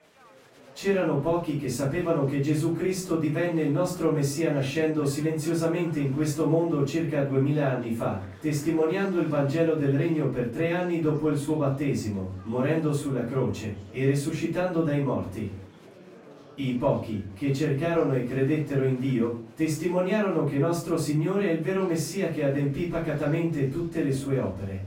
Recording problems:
off-mic speech; far
room echo; noticeable; dies away in 0.3 s
murmuring crowd; faint; throughout; 25 dB below the speech

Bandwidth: 16 kHz